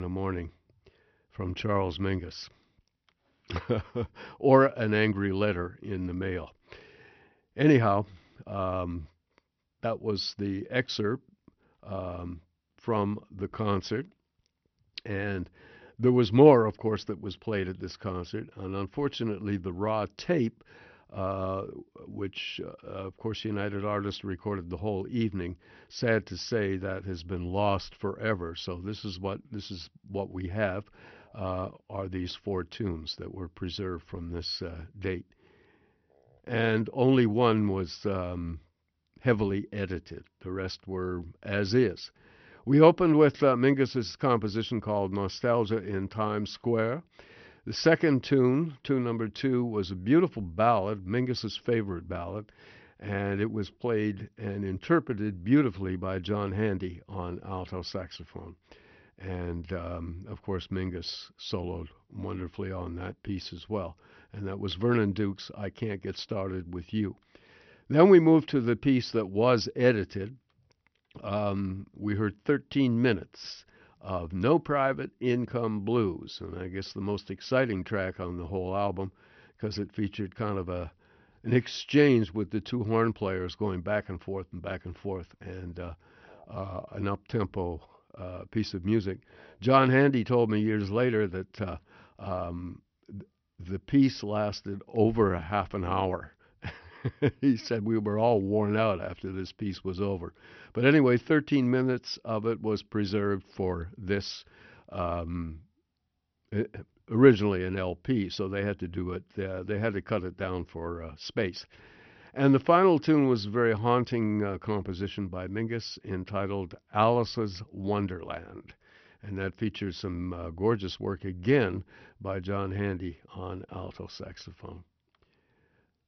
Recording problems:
high frequencies cut off; noticeable; nothing above 6 kHz
abrupt cut into speech; at the start

